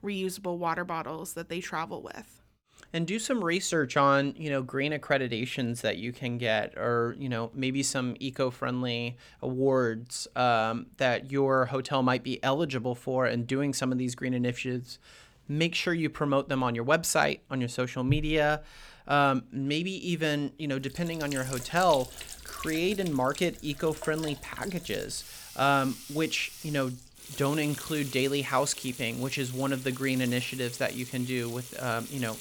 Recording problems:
household noises; noticeable; from 21 s on; 10 dB below the speech

